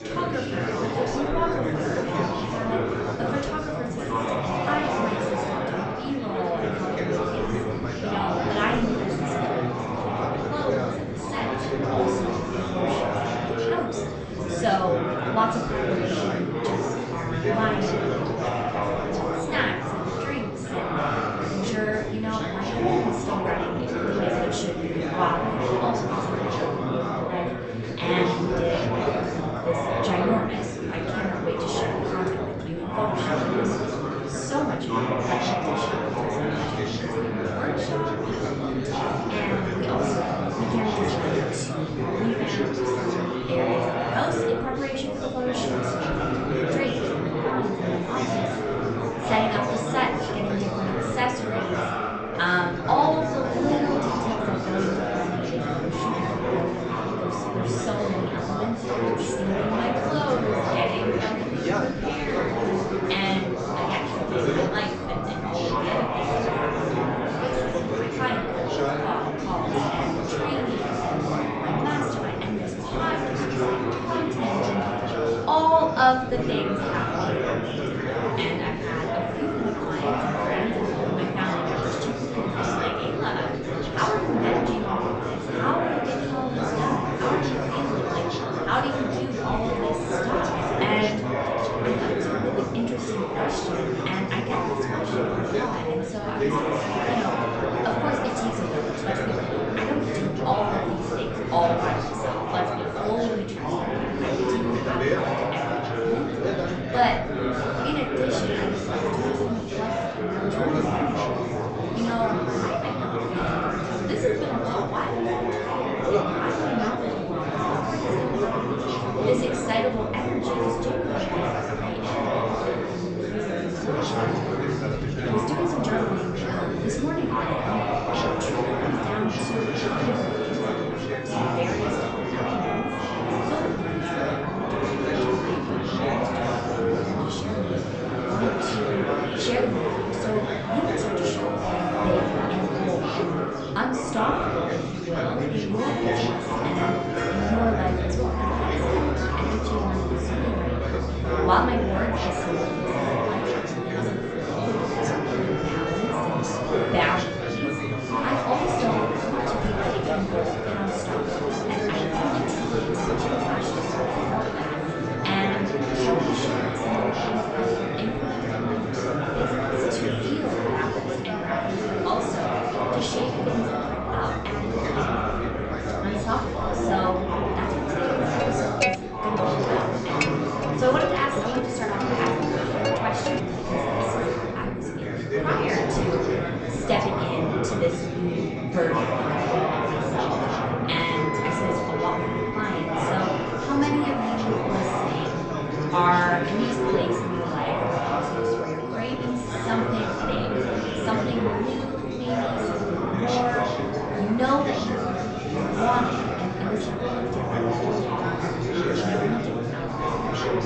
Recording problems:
off-mic speech; far
echo of what is said; noticeable; from 2:41 on; 500 ms later, 15 dB below the speech
high frequencies cut off; noticeable; nothing above 8 kHz
room echo; slight; dies away in 0.5 s
chatter from many people; very loud; throughout; 3 dB above the speech
background music; loud; from 2:04 on; 6 dB below the speech

